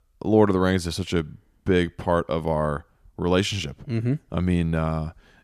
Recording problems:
none

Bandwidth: 14.5 kHz